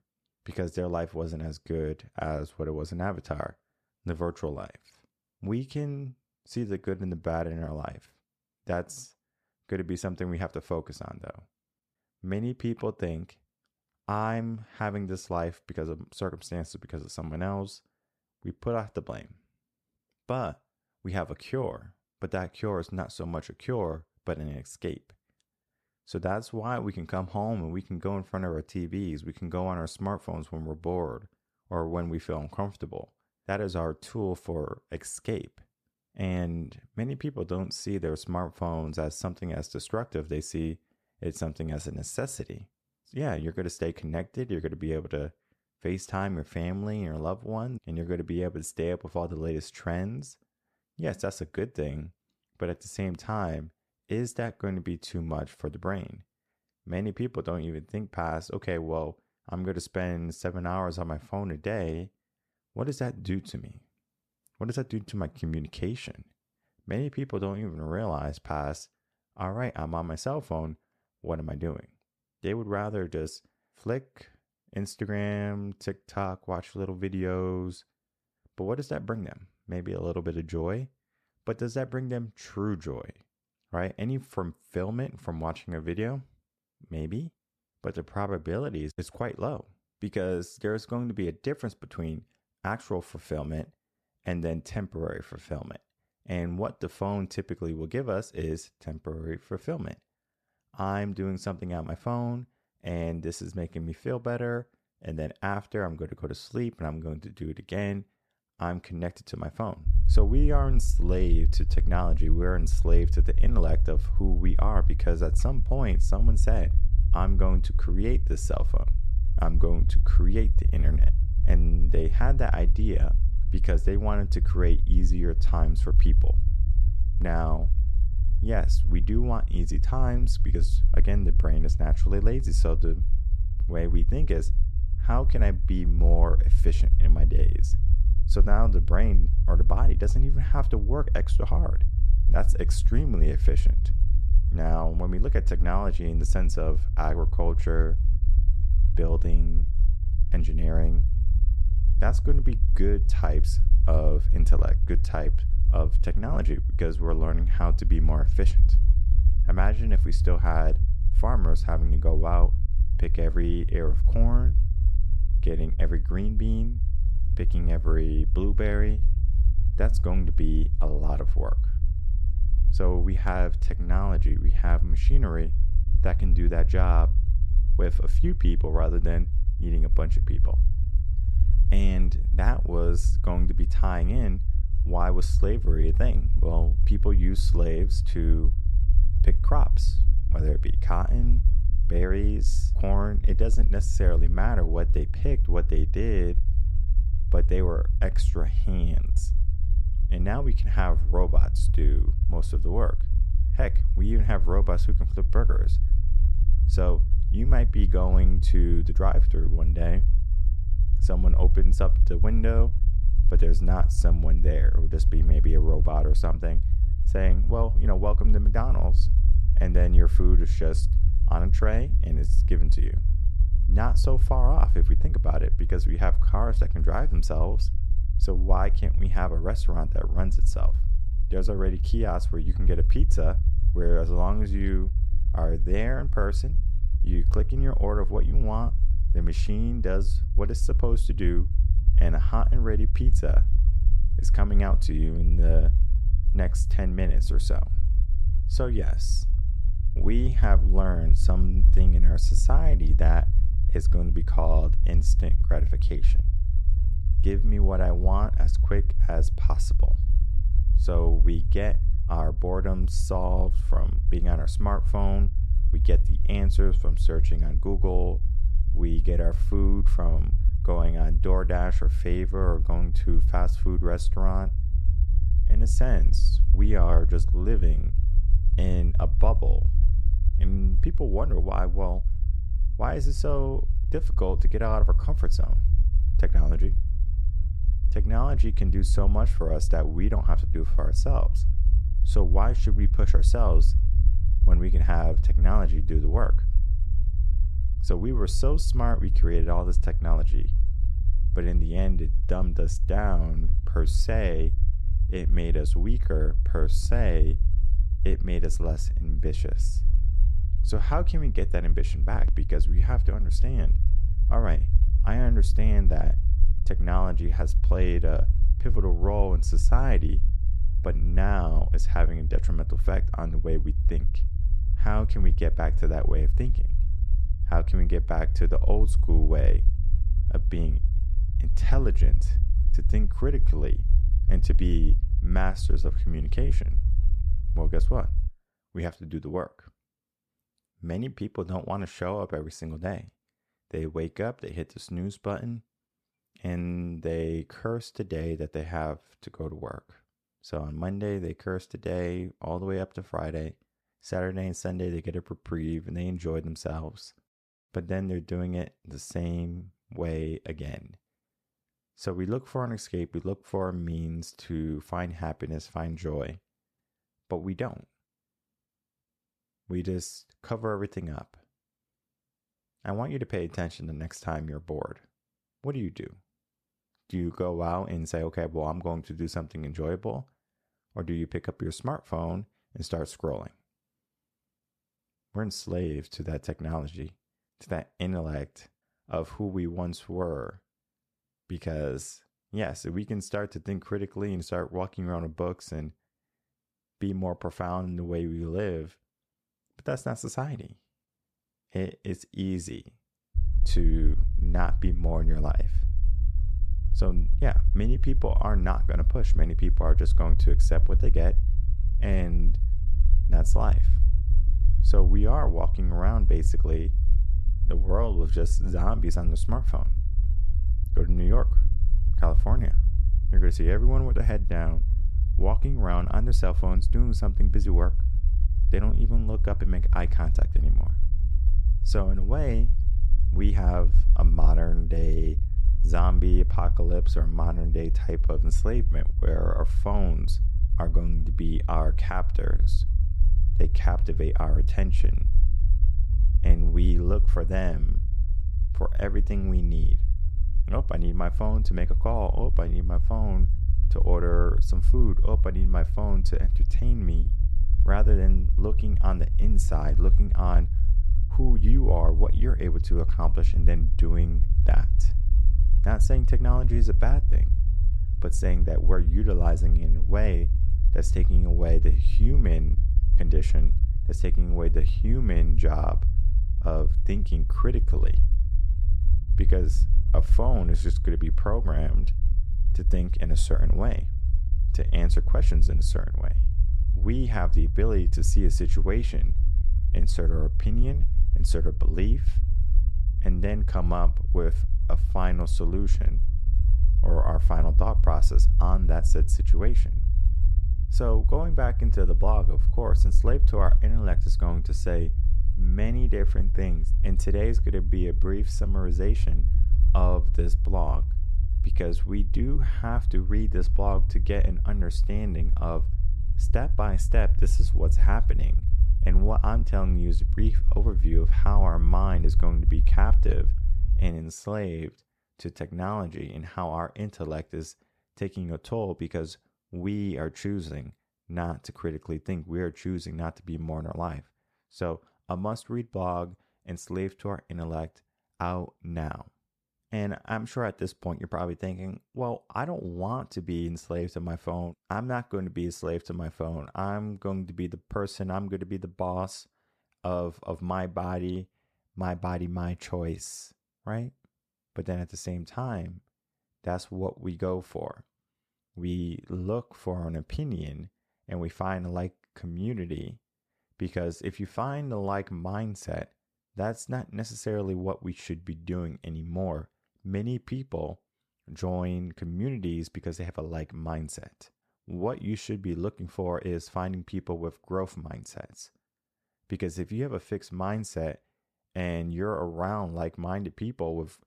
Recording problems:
low rumble; noticeable; from 1:50 to 5:38 and from 6:43 to 8:44; 10 dB below the speech

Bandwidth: 14.5 kHz